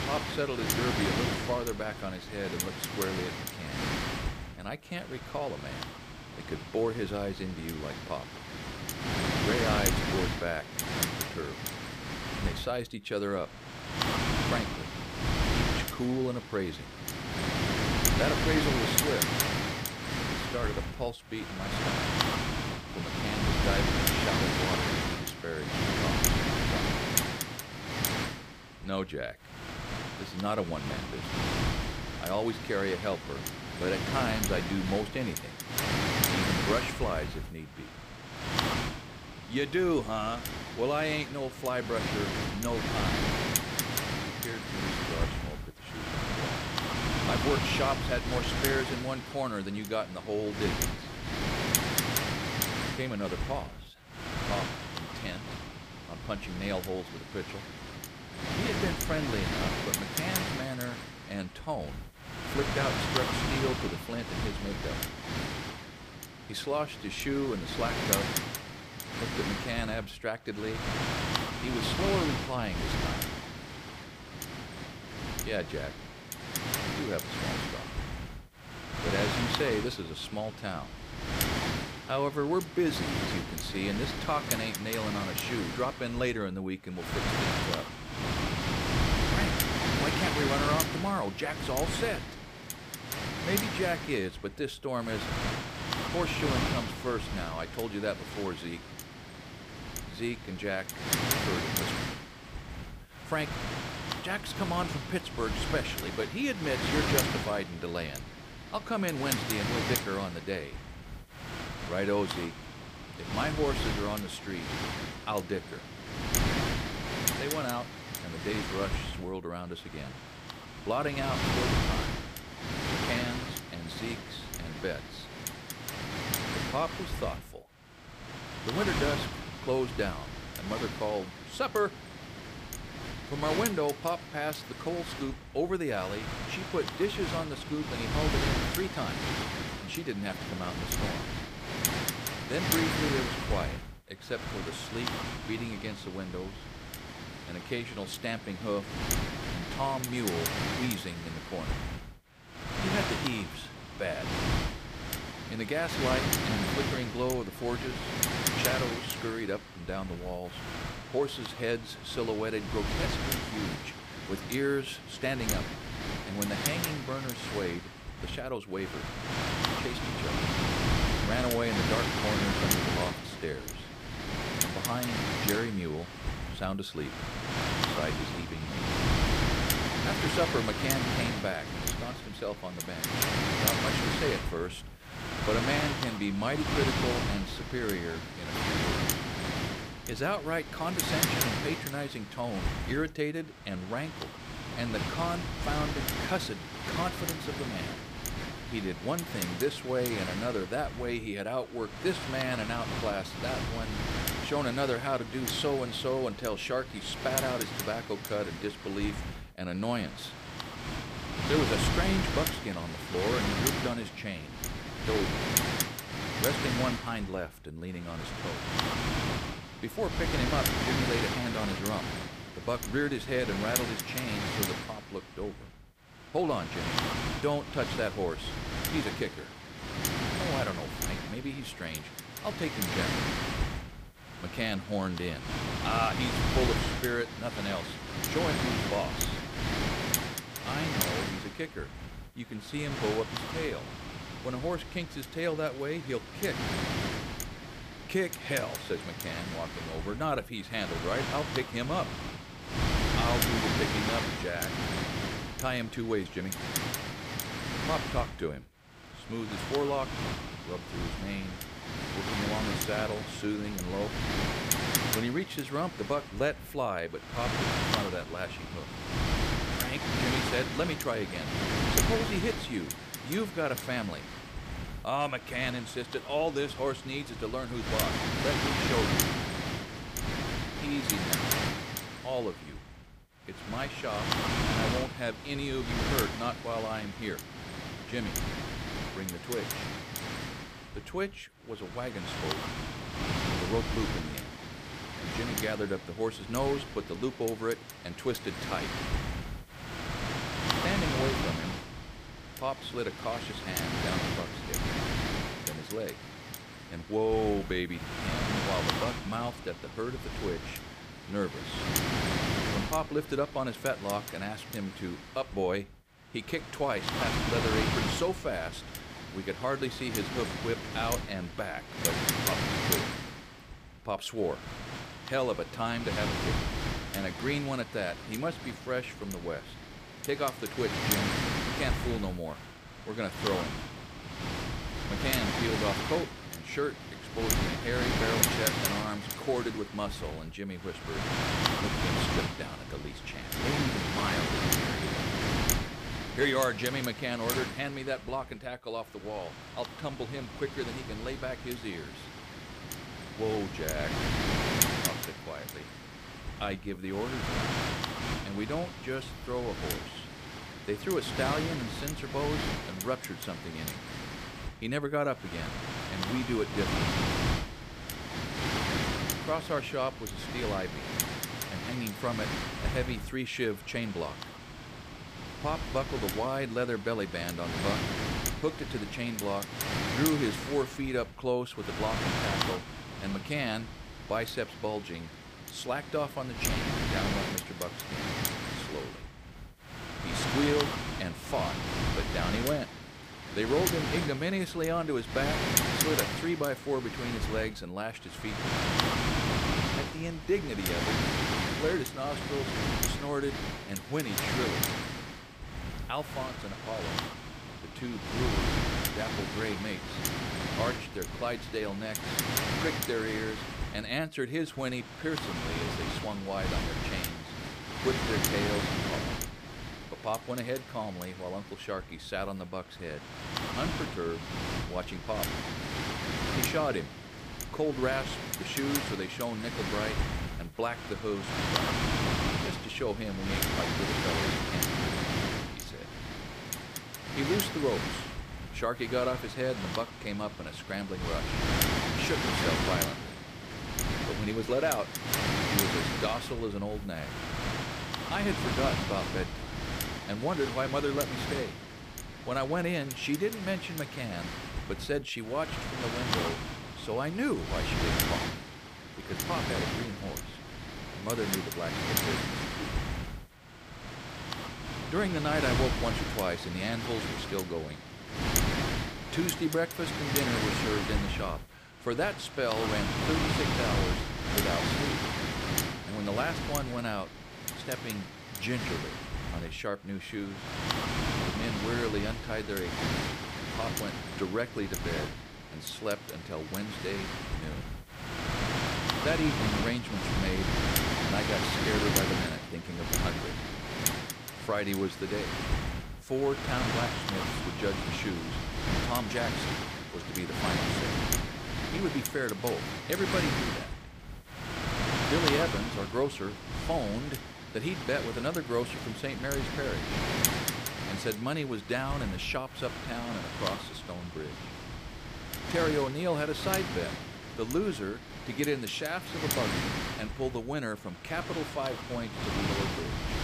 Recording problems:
wind noise on the microphone; heavy; 1 dB above the speech

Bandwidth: 15 kHz